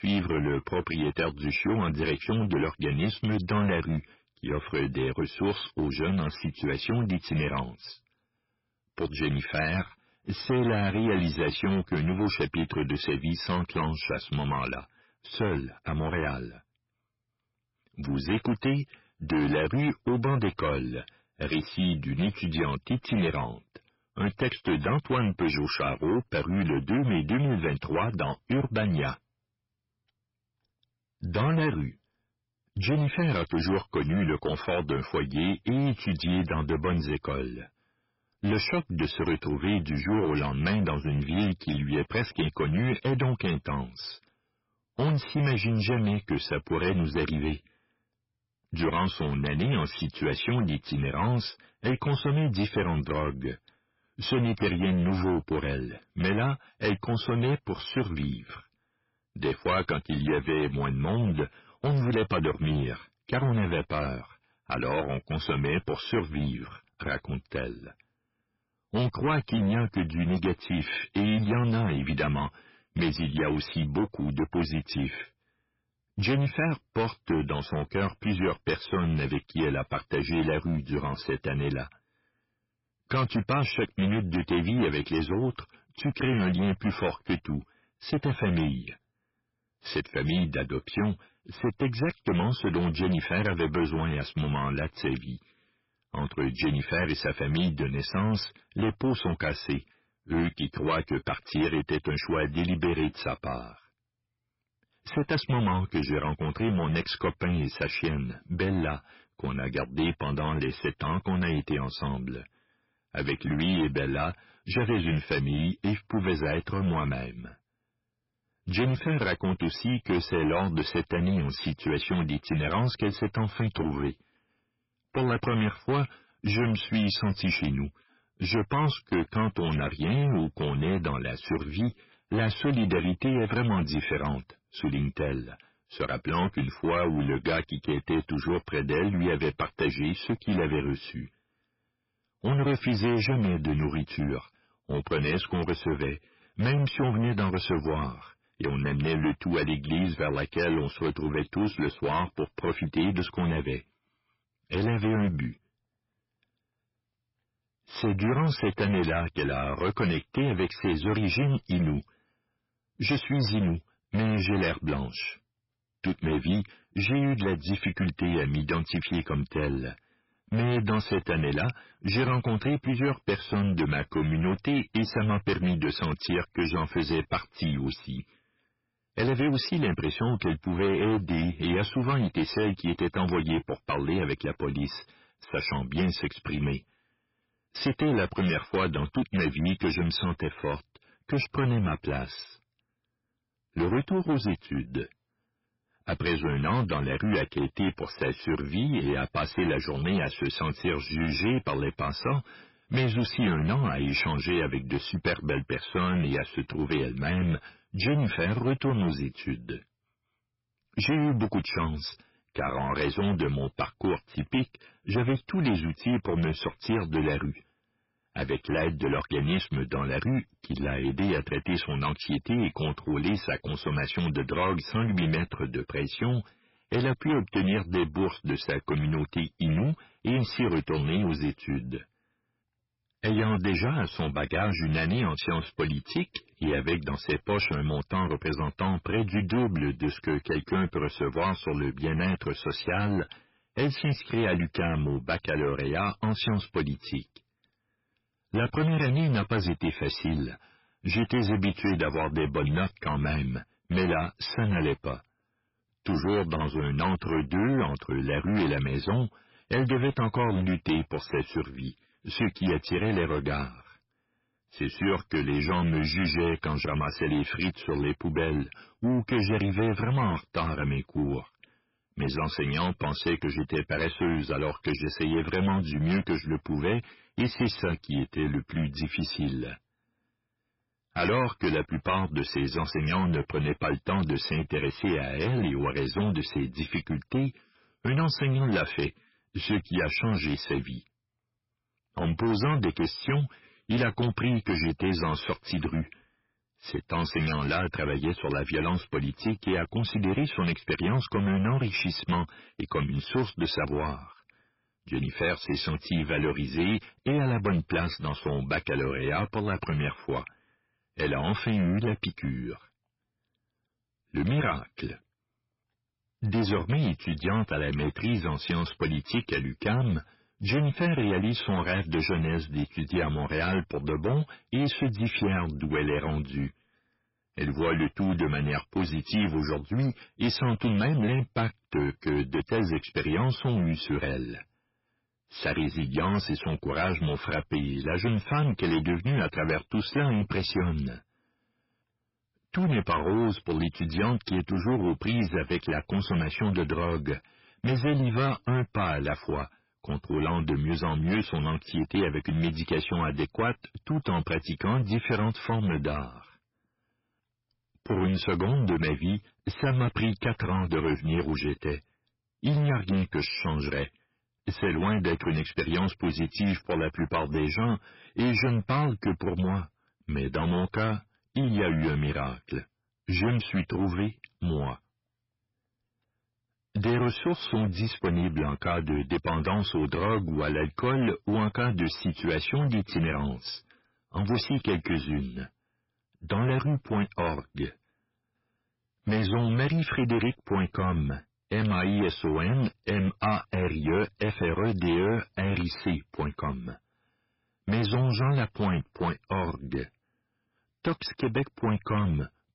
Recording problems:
distortion; heavy; 11% of the sound clipped
garbled, watery; badly; nothing above 5.5 kHz

